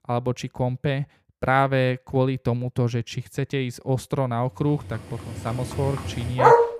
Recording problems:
animal sounds; very loud; from 5 s on; 2 dB above the speech

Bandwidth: 14.5 kHz